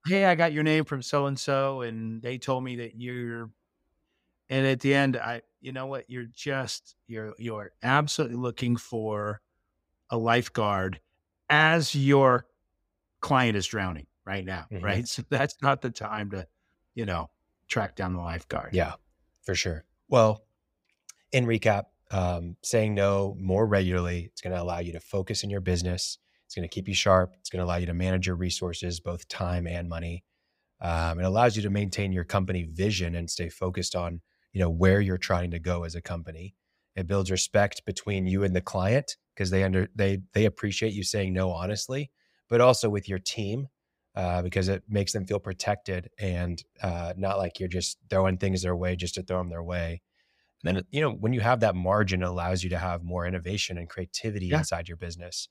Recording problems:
none

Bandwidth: 15.5 kHz